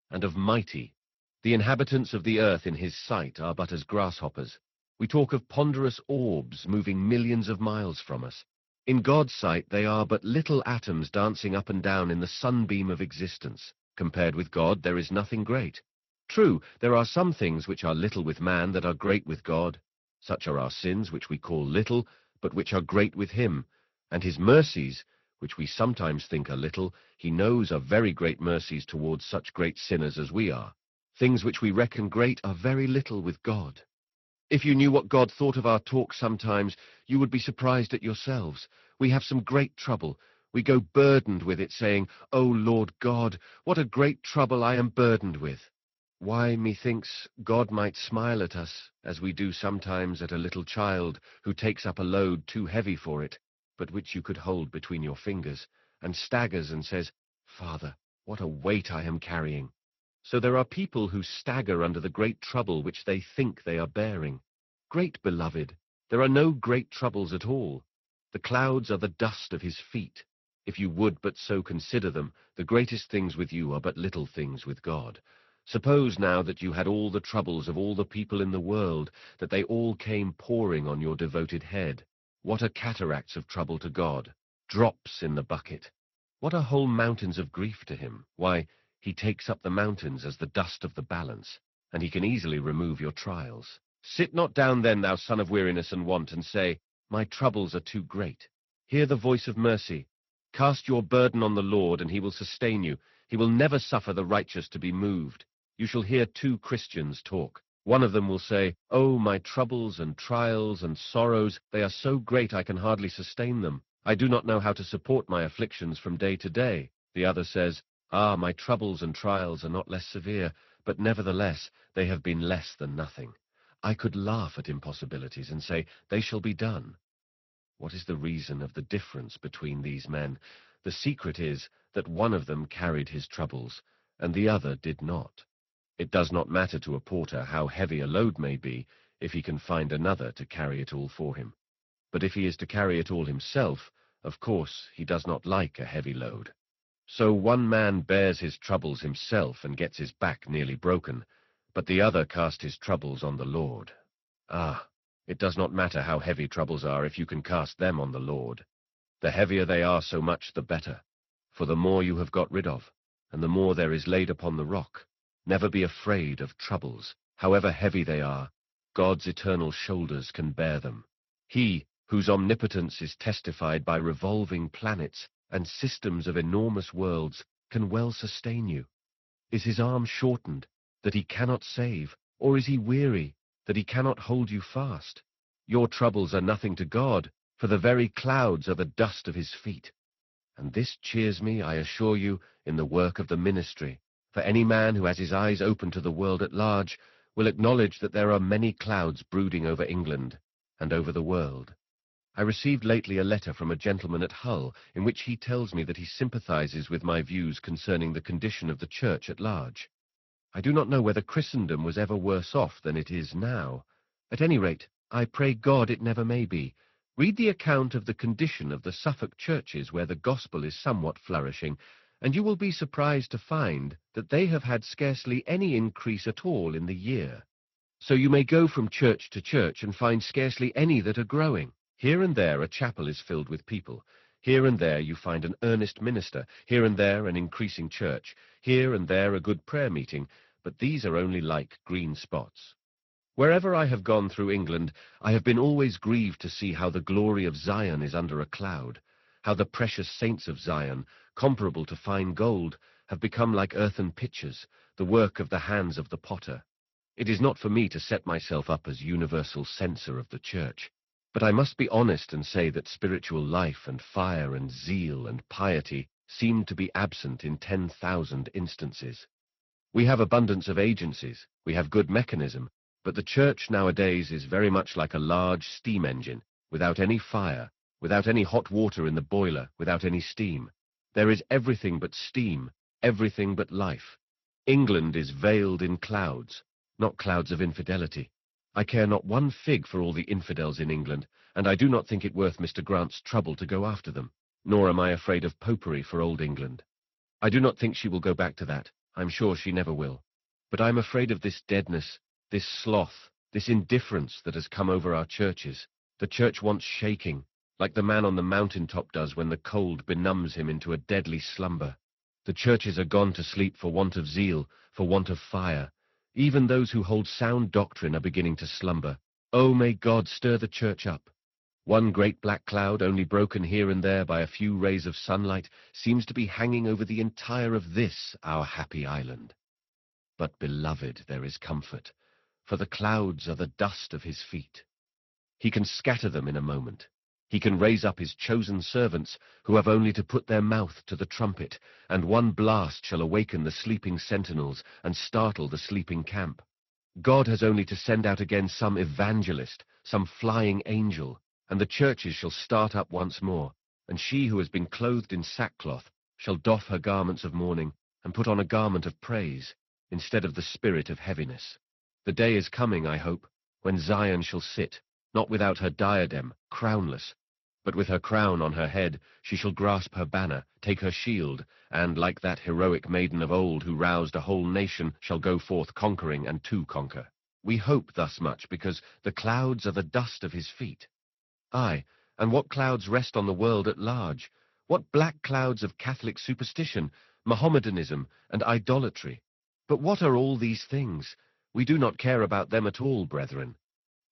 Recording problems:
garbled, watery; slightly; nothing above 6 kHz

